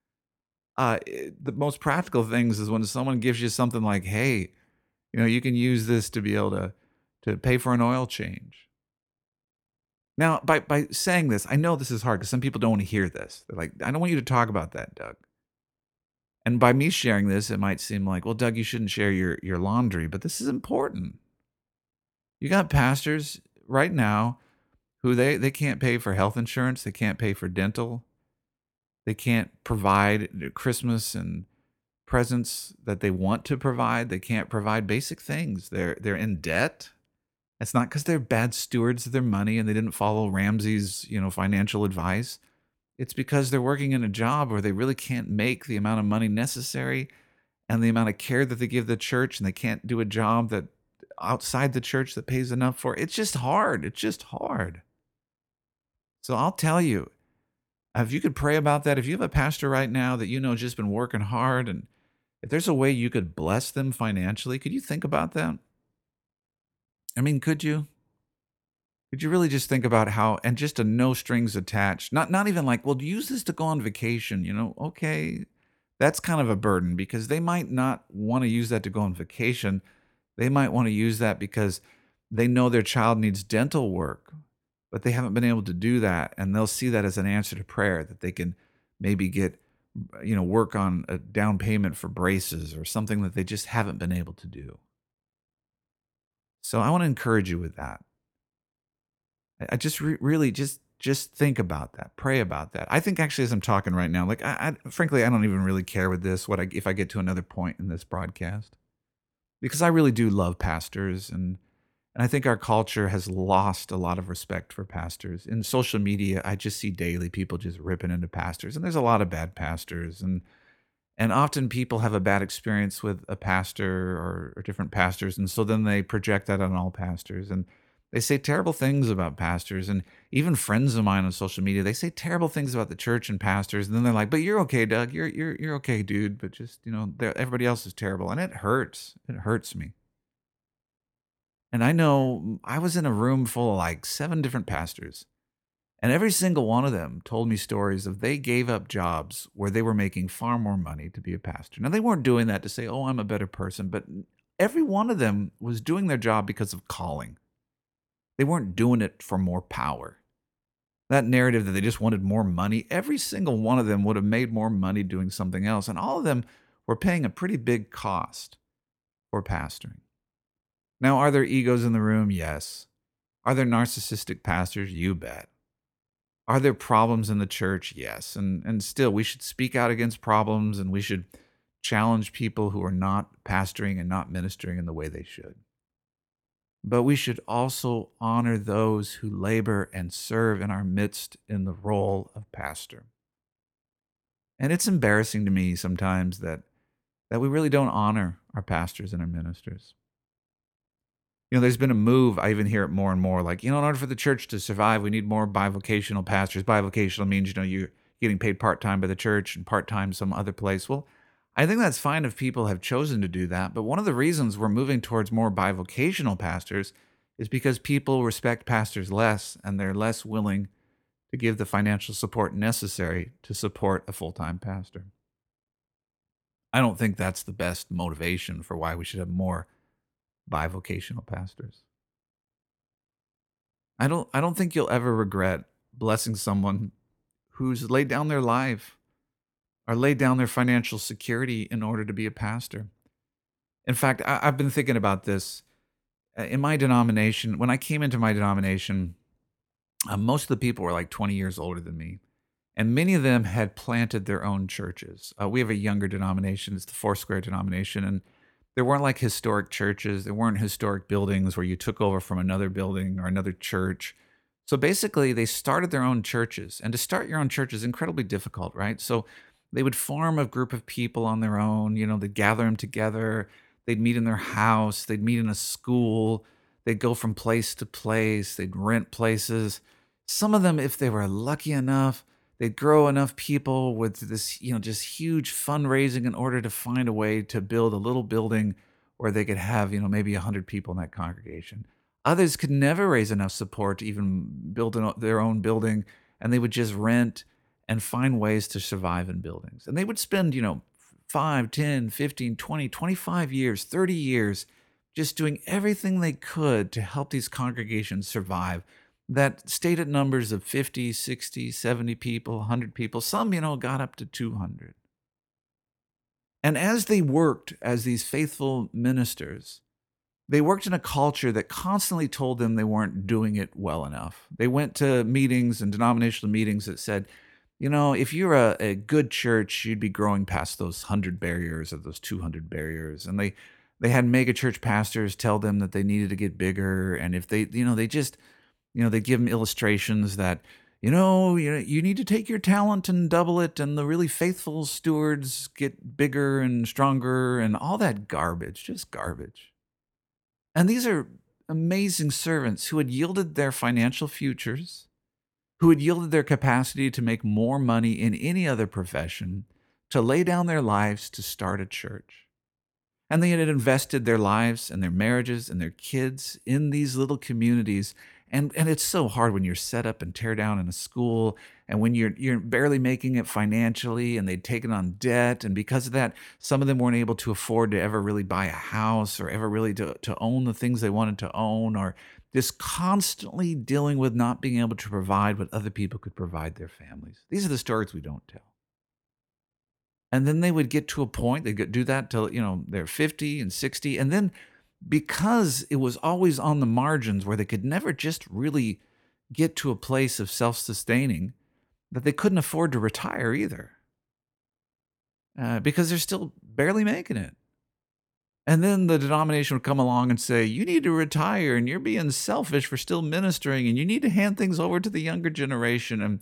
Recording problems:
none

